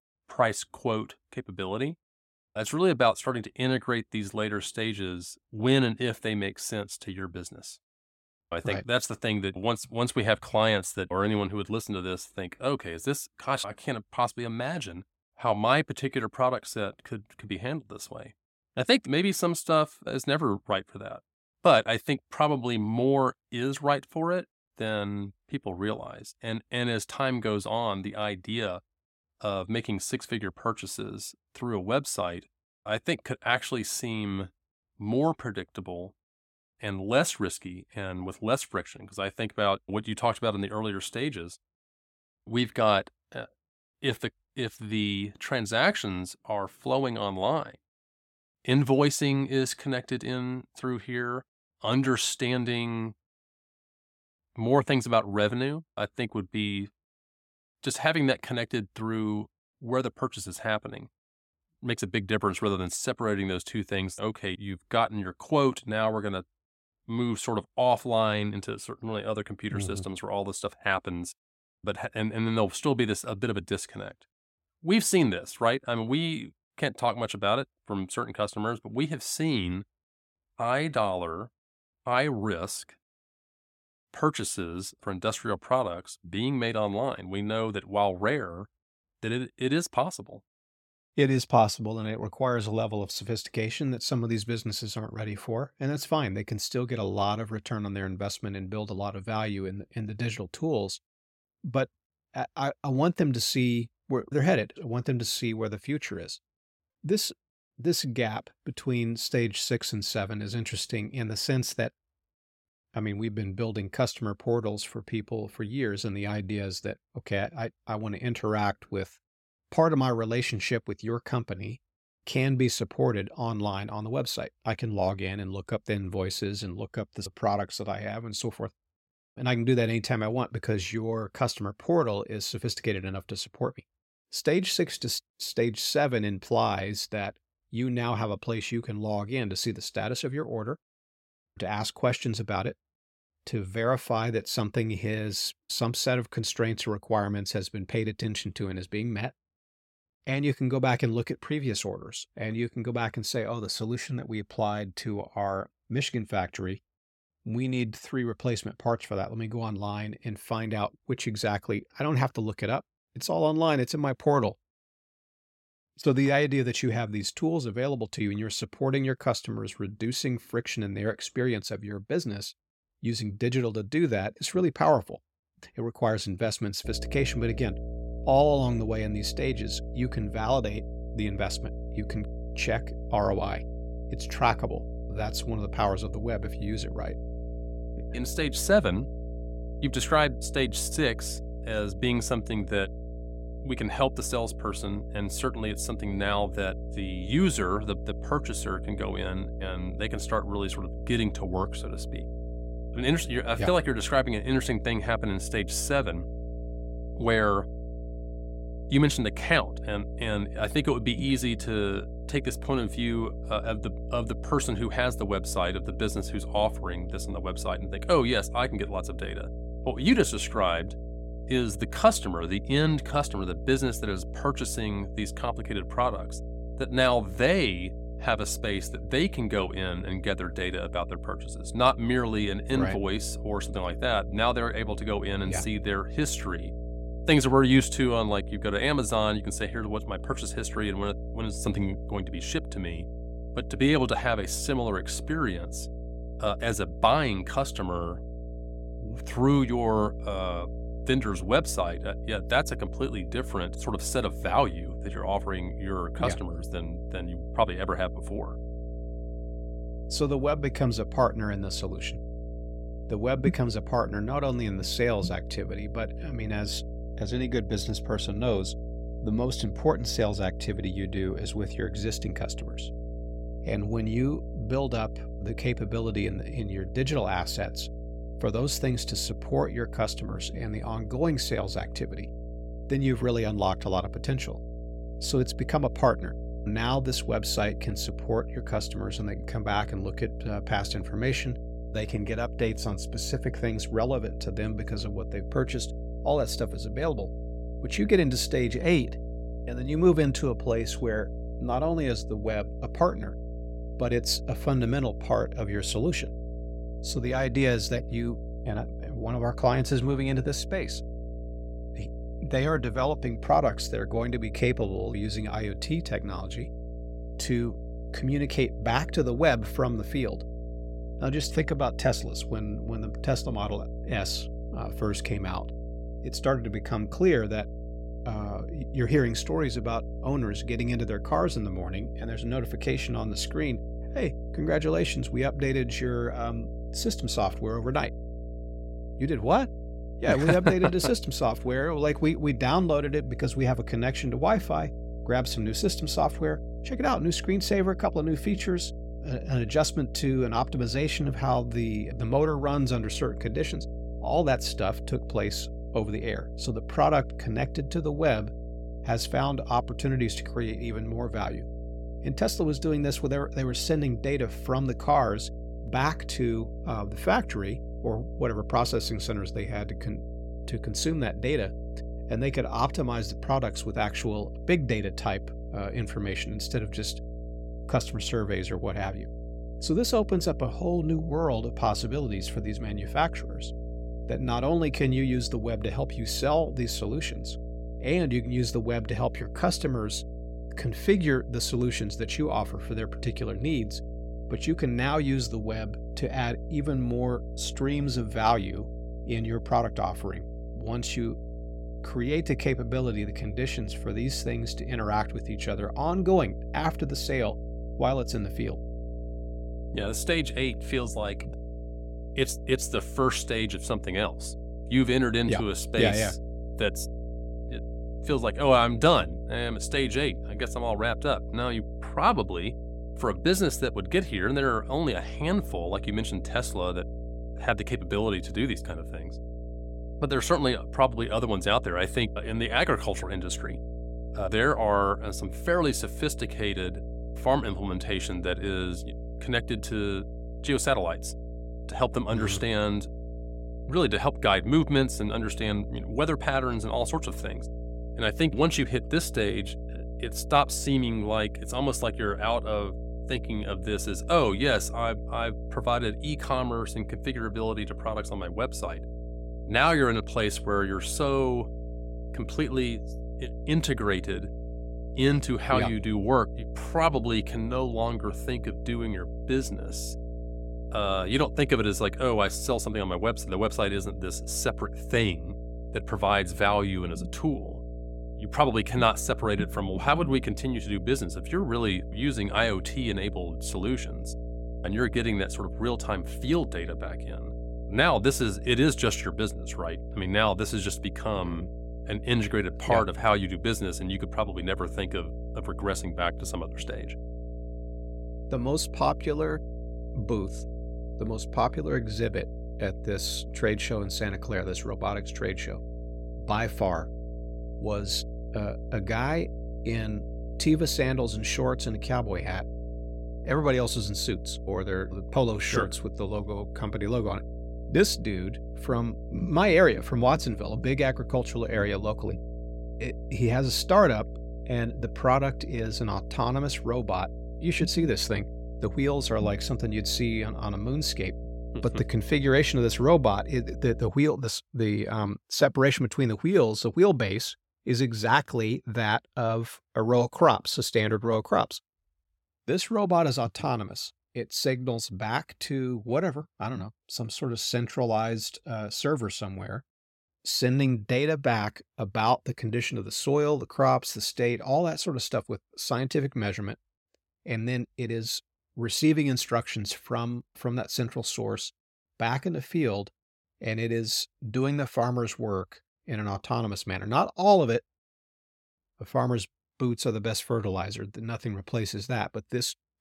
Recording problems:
electrical hum; noticeable; from 2:57 to 8:54; 60 Hz, 15 dB below the speech

